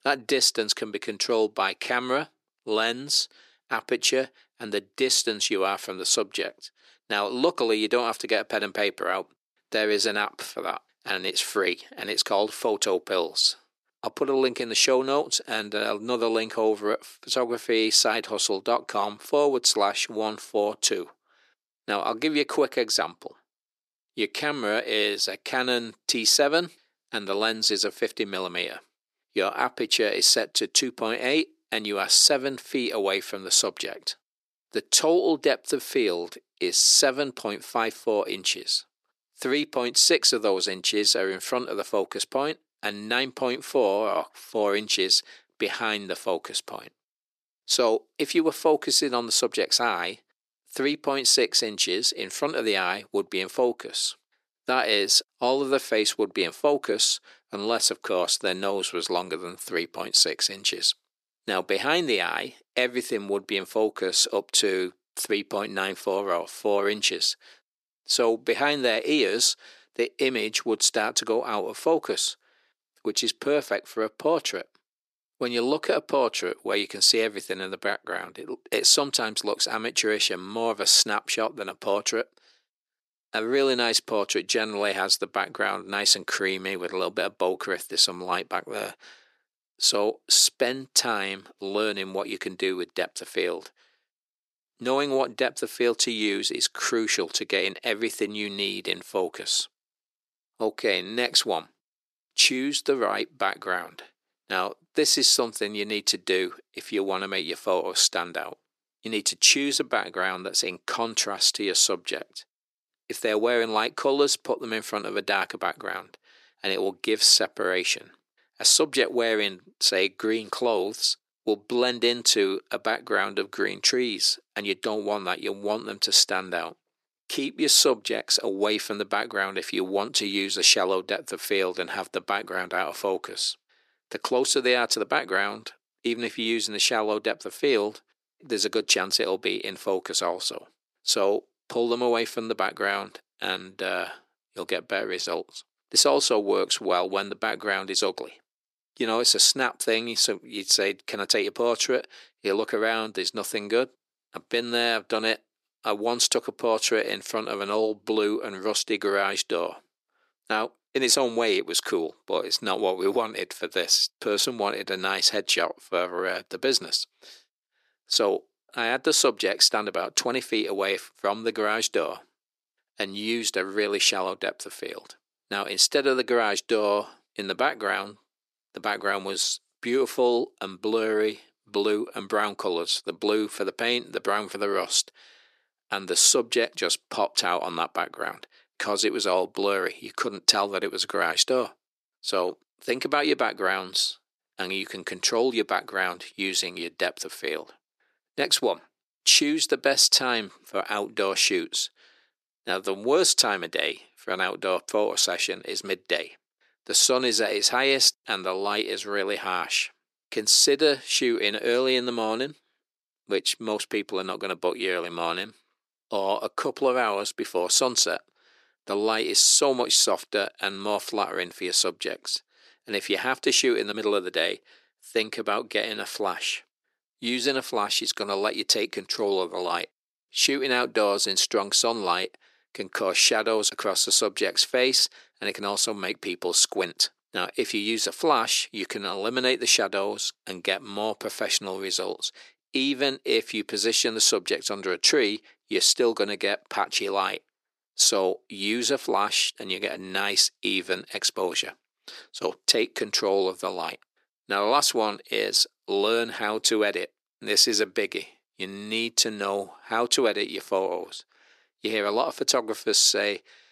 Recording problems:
thin; very; fading below 350 Hz

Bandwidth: 13.5 kHz